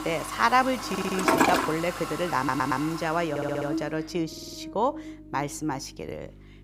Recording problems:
household noises; loud; until 3 s; 1 dB below the speech
electrical hum; noticeable; throughout; 50 Hz, 15 dB below the speech
audio stuttering; 4 times, first at 1 s

